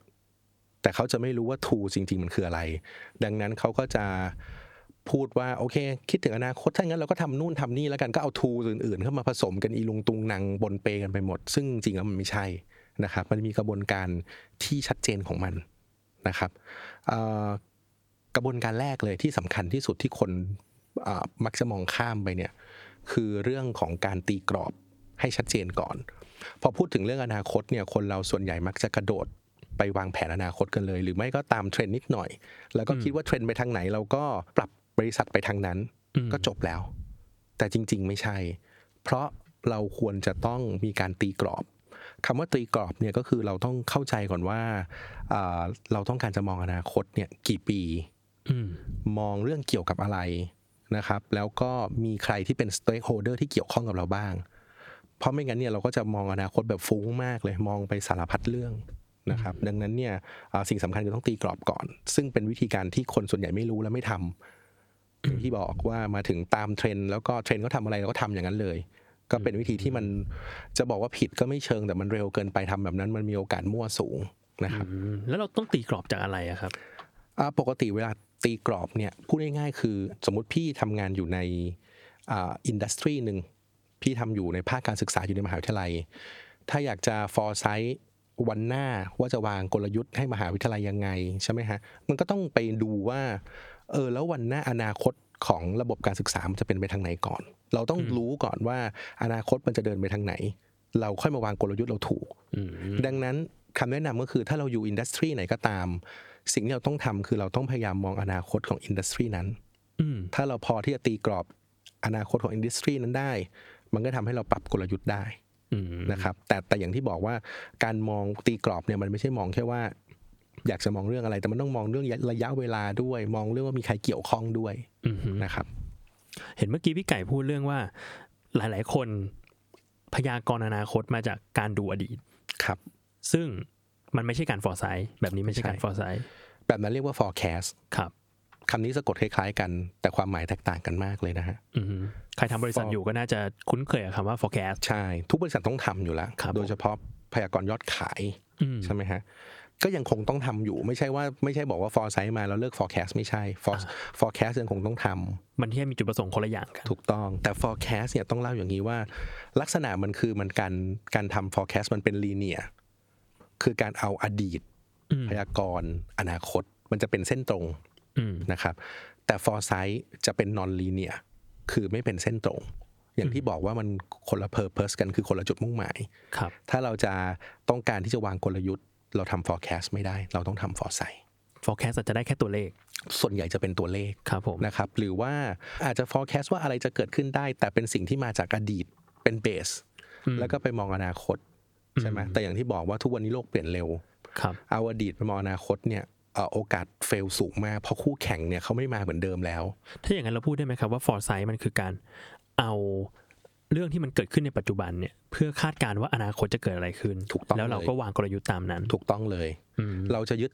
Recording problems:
squashed, flat; somewhat

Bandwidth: 18.5 kHz